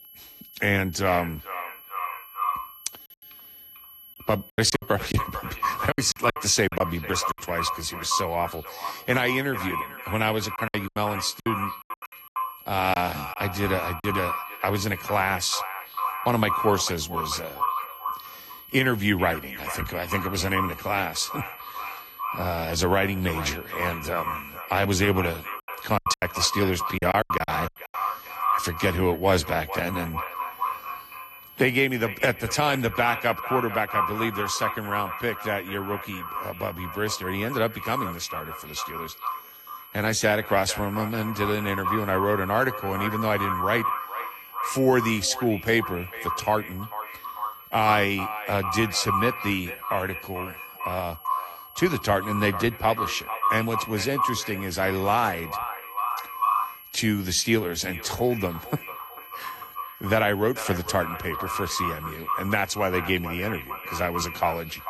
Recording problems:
echo of what is said; strong; throughout; 450 ms later, 6 dB below the speech
garbled, watery; slightly; nothing above 14 kHz
high-pitched whine; noticeable; throughout; 11.5 kHz, 20 dB below the speech
choppy; very; from 4.5 to 7.5 s, from 11 to 14 s and from 26 to 27 s; 16% of the speech affected

